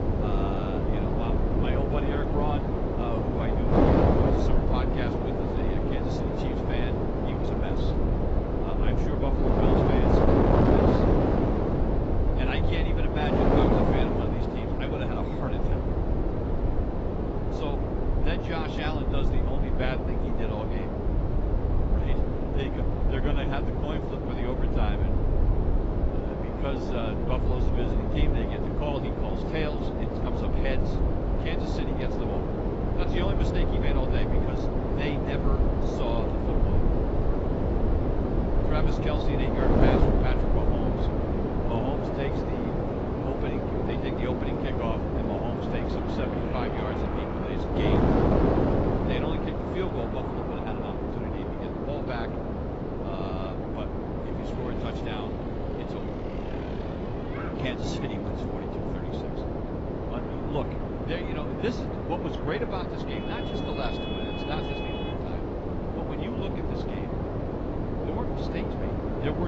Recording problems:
garbled, watery; badly; nothing above 7.5 kHz
wind noise on the microphone; heavy; 5 dB above the speech
traffic noise; loud; from 40 s on; 7 dB below the speech
low rumble; noticeable; until 42 s; 15 dB below the speech
abrupt cut into speech; at the end

